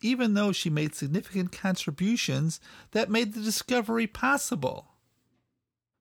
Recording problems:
none

